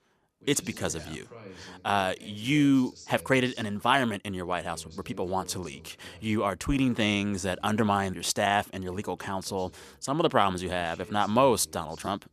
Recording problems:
voice in the background; faint; throughout; 25 dB below the speech

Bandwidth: 14.5 kHz